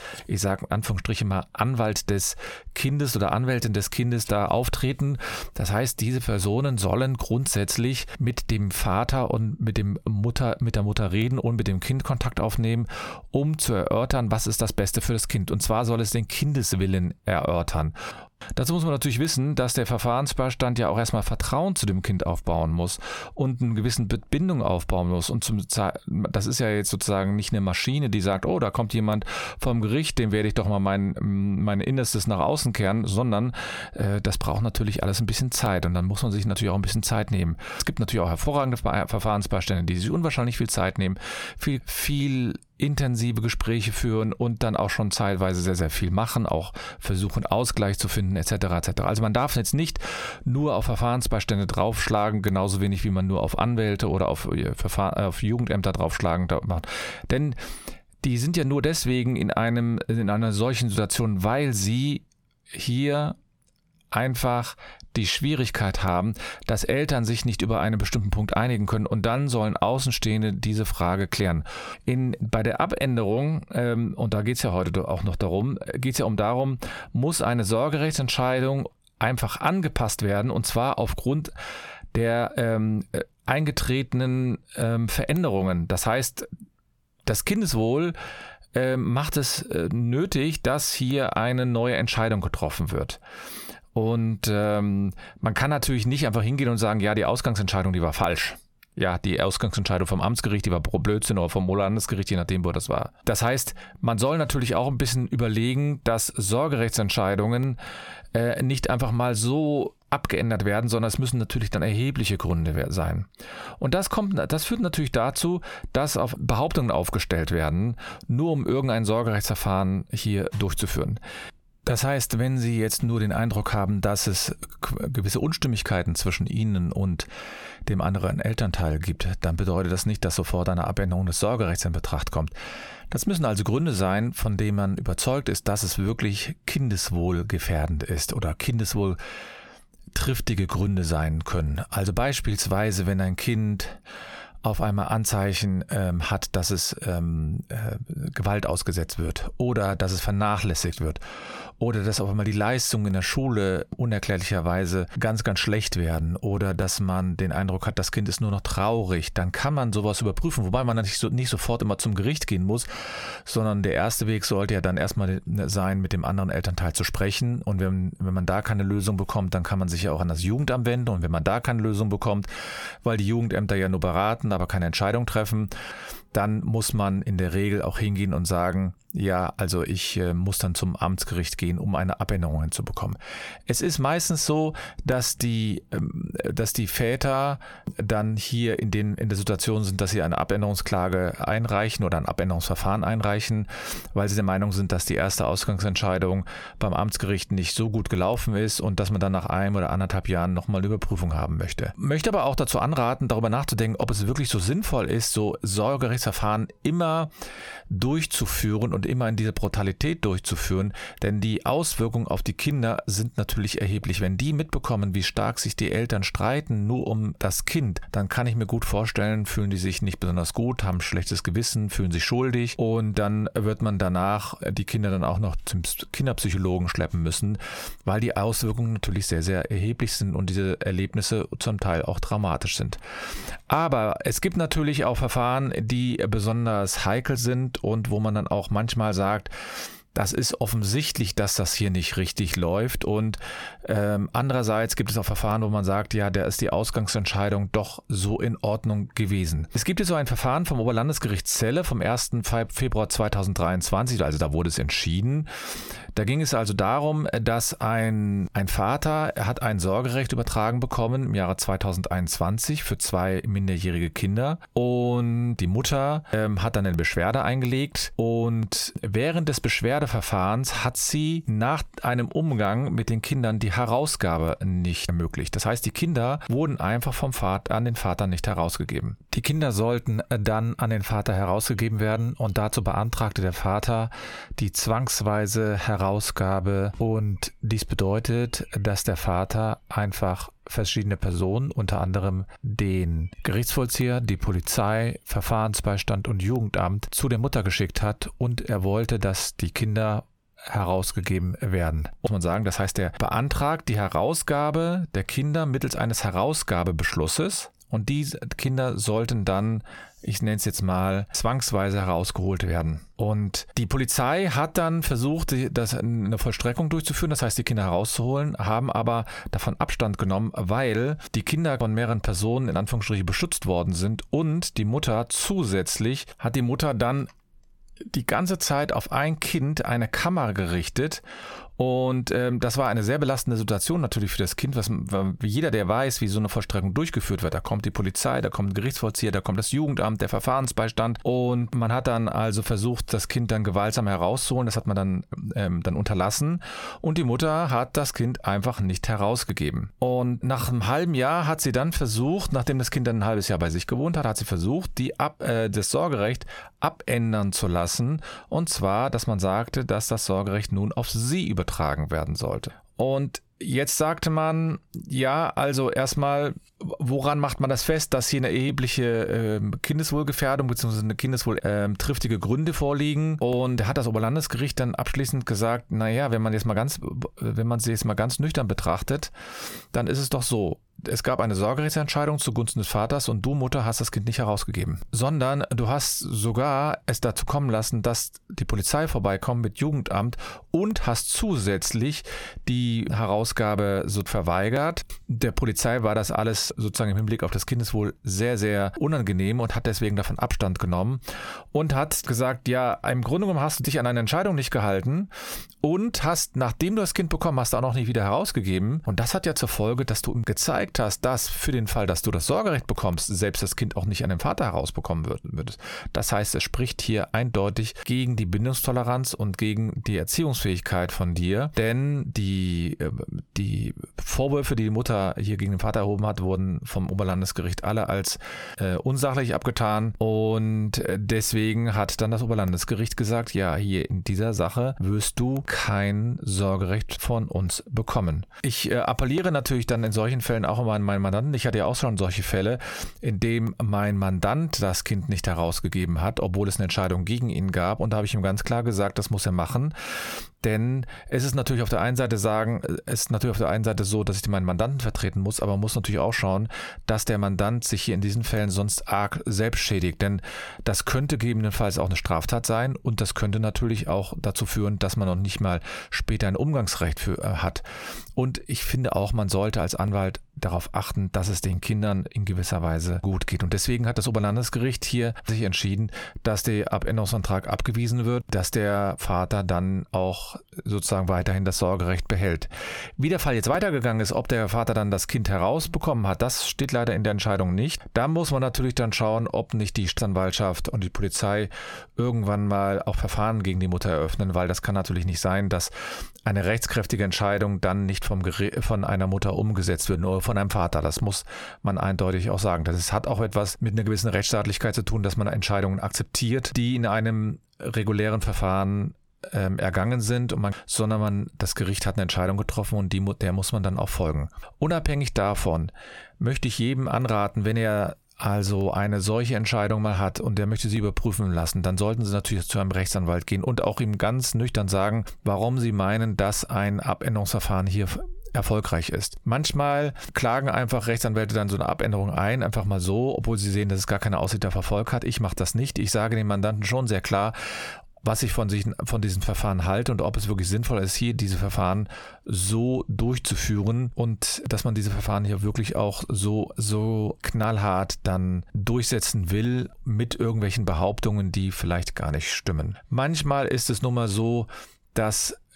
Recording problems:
squashed, flat; heavily

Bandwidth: 18 kHz